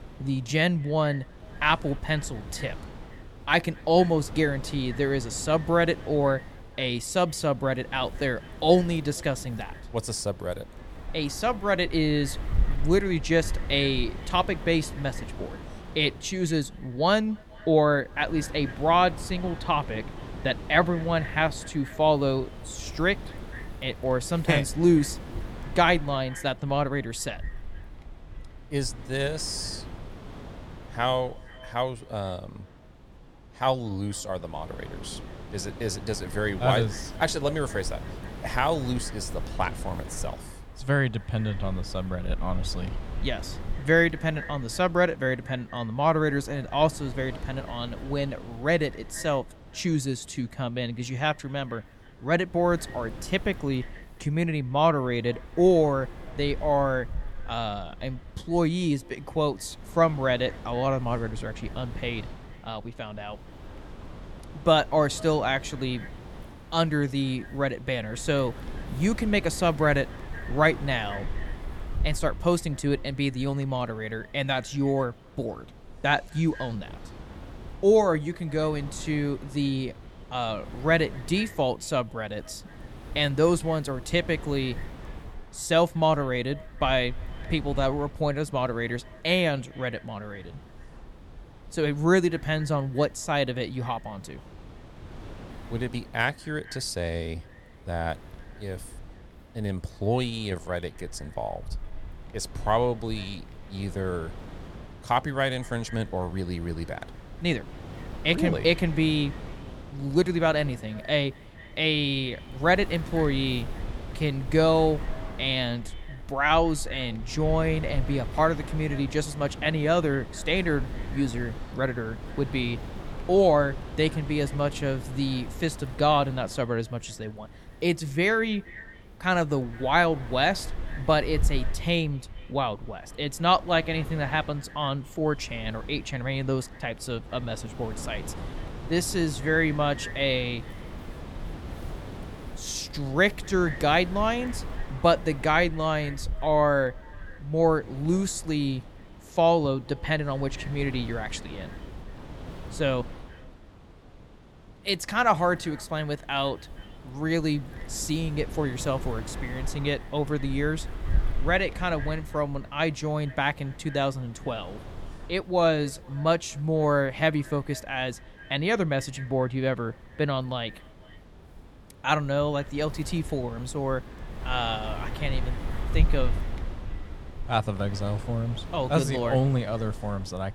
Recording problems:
echo of what is said; faint; throughout; 230 ms later, 25 dB below the speech
wind noise on the microphone; occasional gusts; 20 dB below the speech

